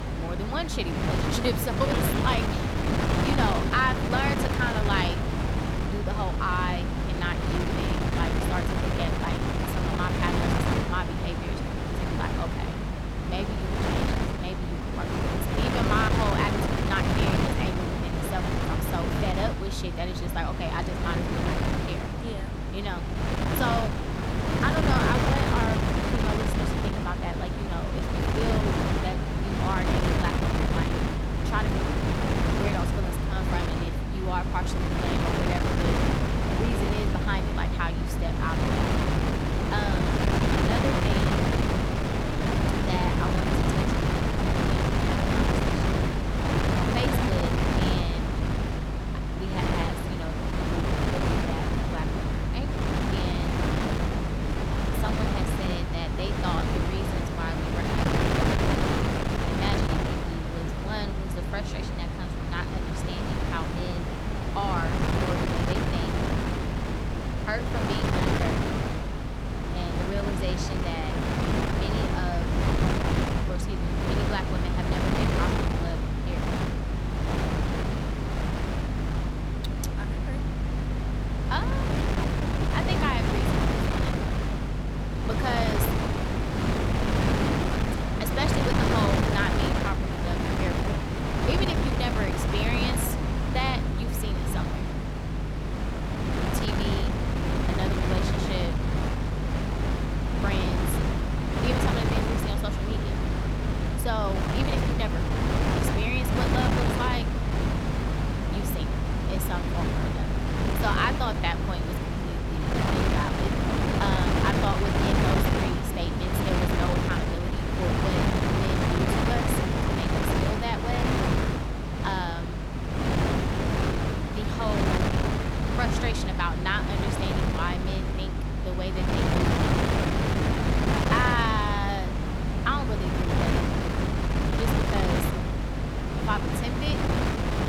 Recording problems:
wind noise on the microphone; heavy; 2 dB above the speech
electrical hum; noticeable; throughout; 50 Hz, 15 dB below the speech

